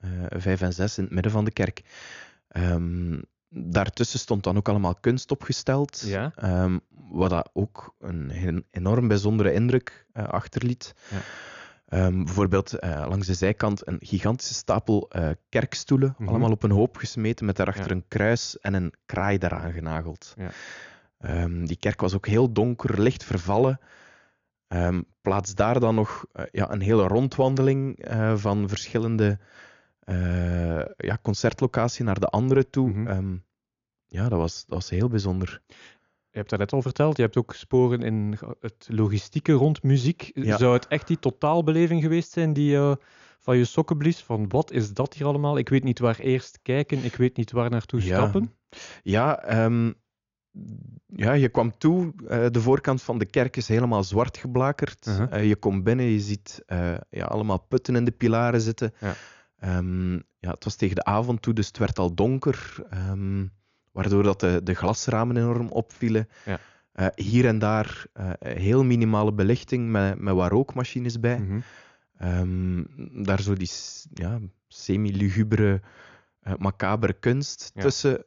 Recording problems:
high frequencies cut off; noticeable; nothing above 7 kHz

